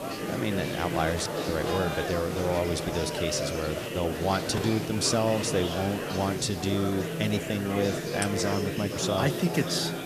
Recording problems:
murmuring crowd; loud; throughout; 3 dB below the speech
hiss; noticeable; throughout; 15 dB below the speech

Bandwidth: 14.5 kHz